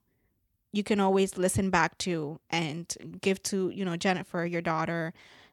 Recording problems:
none

